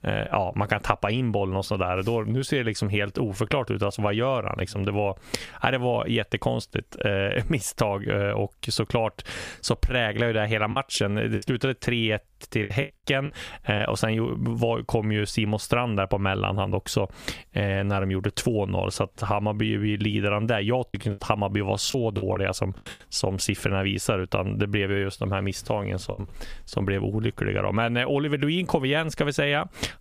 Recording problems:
squashed, flat; somewhat
choppy; very; from 11 to 14 s, from 21 to 22 s and at 26 s; 8% of the speech affected

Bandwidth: 15 kHz